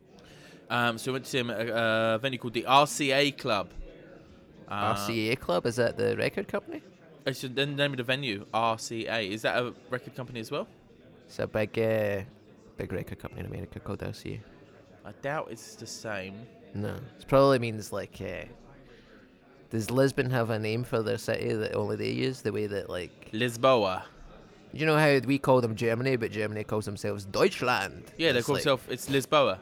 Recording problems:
chatter from many people; faint; throughout; 25 dB below the speech

